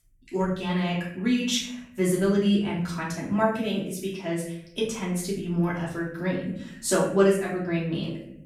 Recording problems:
off-mic speech; far
room echo; noticeable; dies away in 0.7 s

